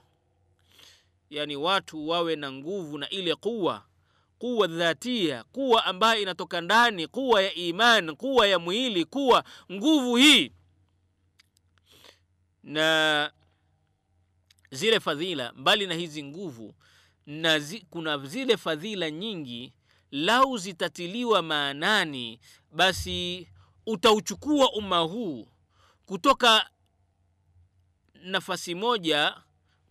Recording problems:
none

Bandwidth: 15 kHz